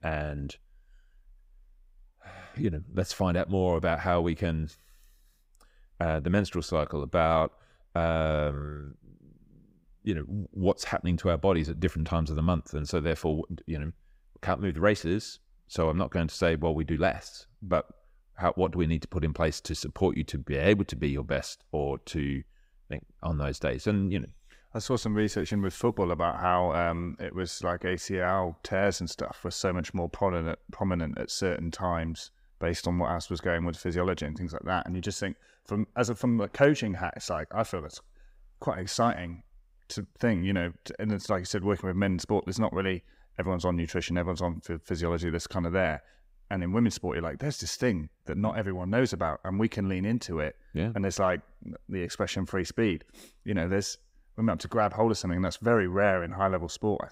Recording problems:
none

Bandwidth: 15.5 kHz